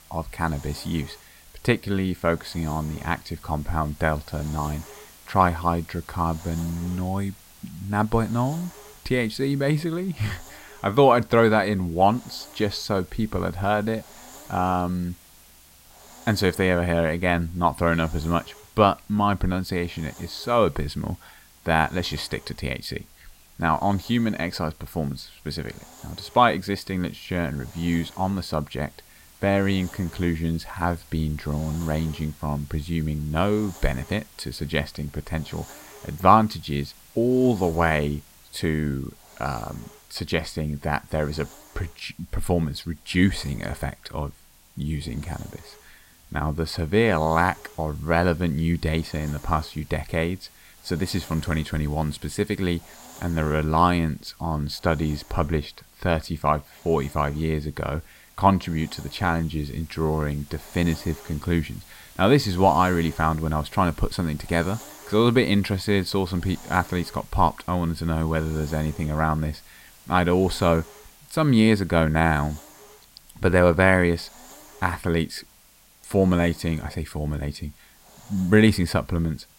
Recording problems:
hiss; faint; throughout; 20 dB below the speech

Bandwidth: 16 kHz